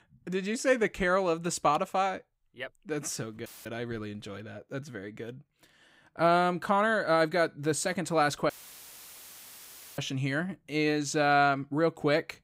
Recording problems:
audio cutting out; filled with static; at 3.5 s and at 8.5 s for 1.5 s

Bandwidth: 15.5 kHz